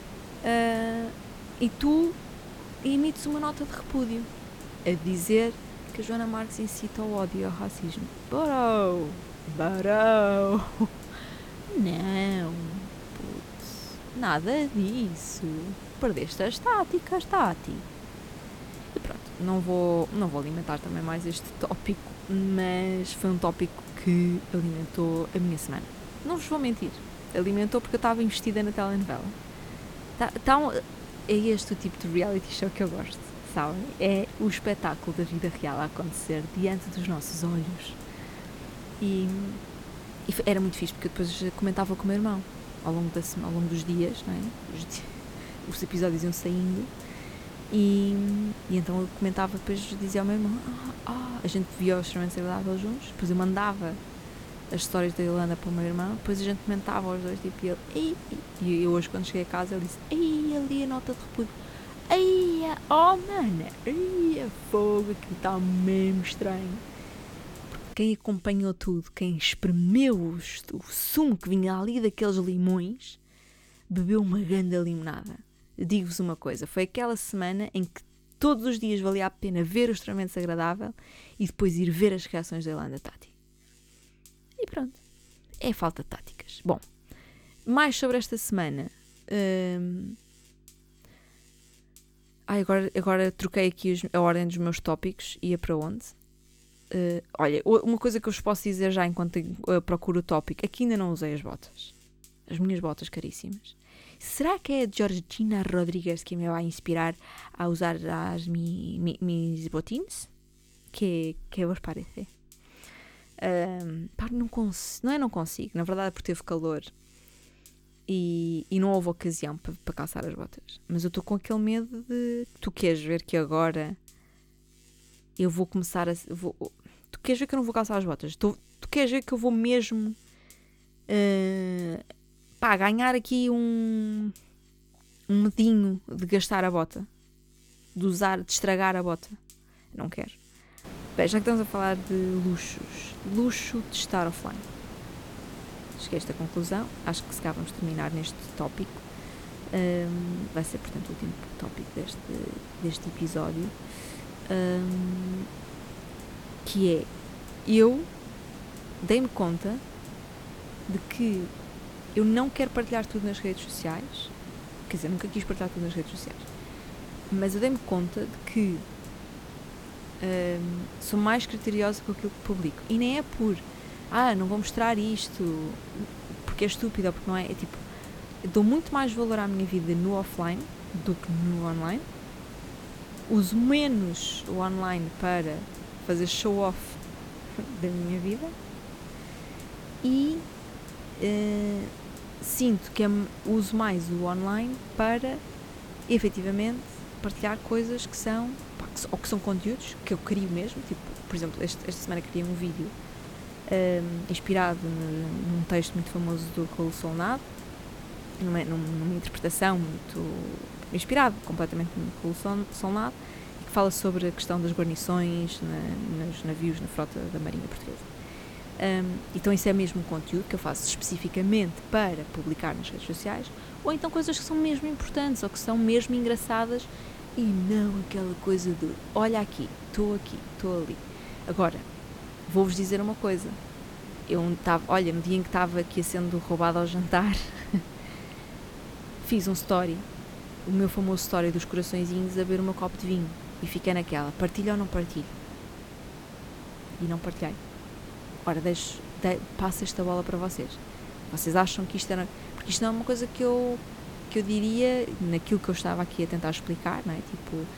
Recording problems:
hiss; noticeable; until 1:08 and from 2:21 on; 15 dB below the speech
electrical hum; faint; until 3:35; 50 Hz, 30 dB below the speech

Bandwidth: 17.5 kHz